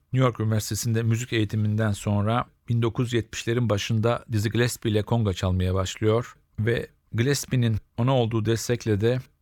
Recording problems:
none

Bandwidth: 18.5 kHz